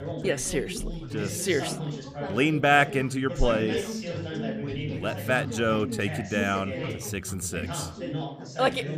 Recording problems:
background chatter; loud; throughout; 3 voices, 7 dB below the speech

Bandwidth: 15 kHz